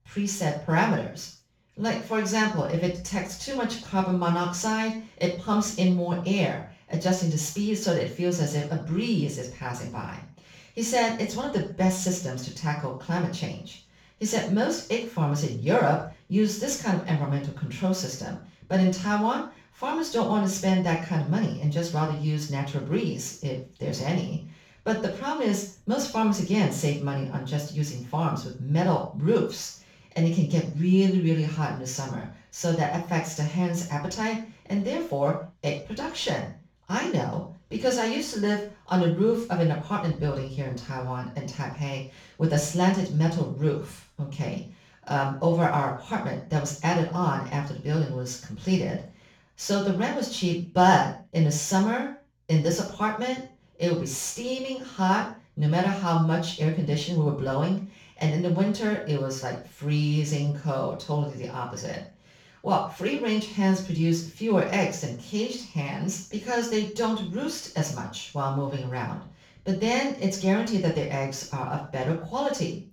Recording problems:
off-mic speech; far
room echo; noticeable; dies away in 0.4 s

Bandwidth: 18.5 kHz